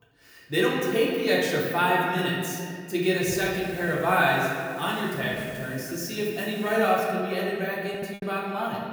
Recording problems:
off-mic speech; far
room echo; noticeable; dies away in 2.1 s
hiss; very faint; from 3 to 7 s; 20 dB below the speech
choppy; occasionally; from 6 to 8 s; 2% of the speech affected

